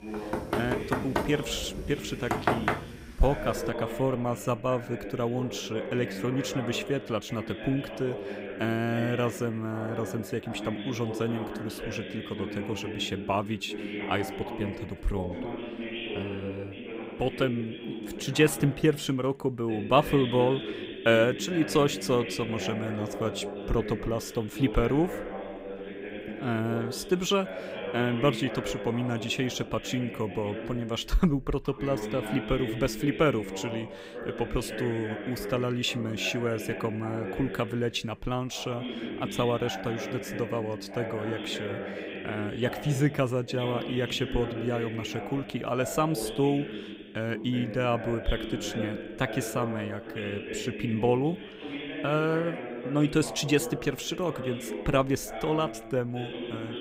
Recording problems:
voice in the background; loud; throughout; 7 dB below the speech
door banging; loud; until 3 s; peak 3 dB above the speech

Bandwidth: 15.5 kHz